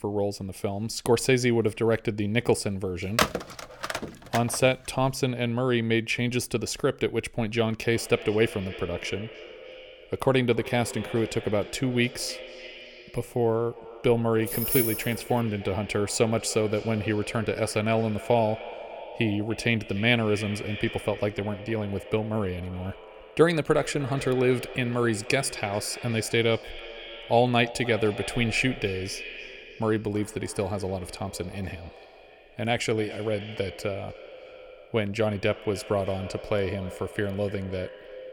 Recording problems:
echo of what is said; noticeable; from 8 s on; 300 ms later, 15 dB below the speech
phone ringing; loud; from 3 to 4.5 s; peak 2 dB above the speech
jangling keys; loud; at 14 s; peak 2 dB above the speech

